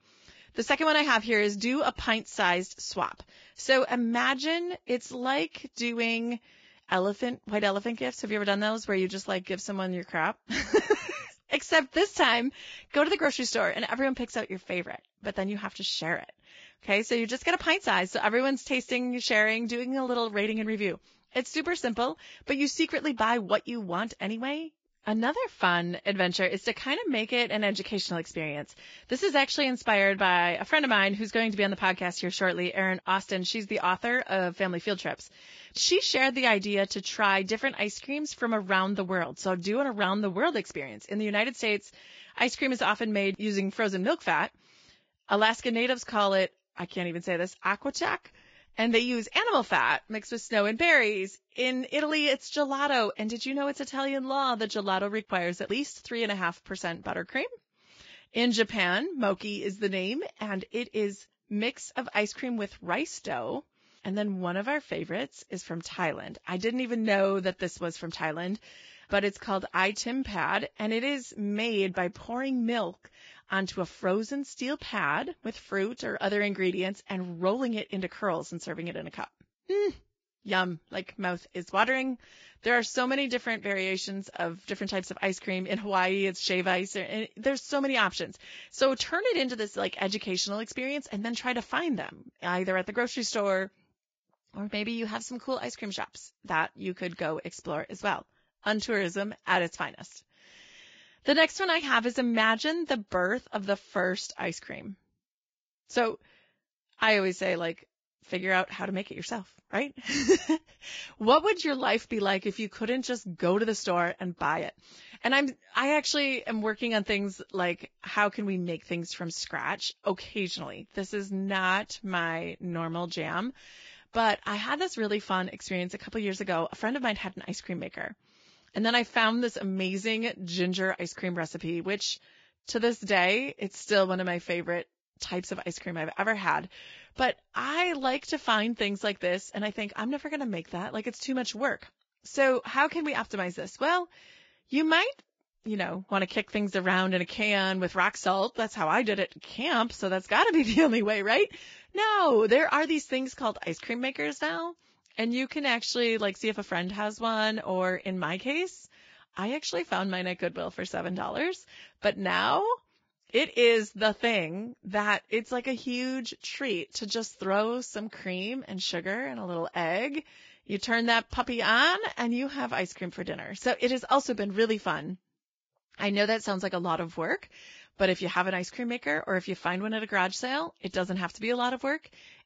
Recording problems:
garbled, watery; badly; nothing above 7.5 kHz

